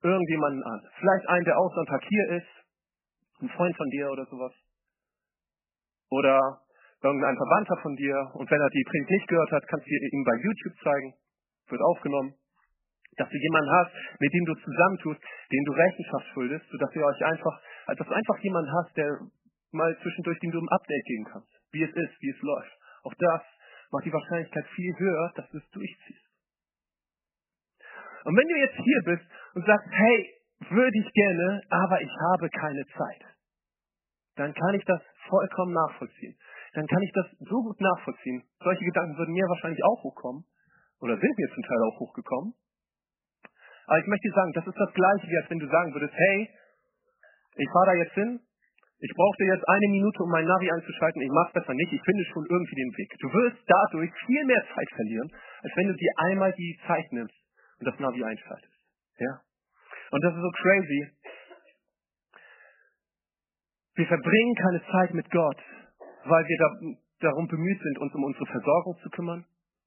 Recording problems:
garbled, watery; badly; nothing above 3 kHz

